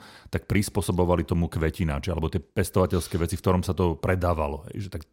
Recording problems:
none

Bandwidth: 16 kHz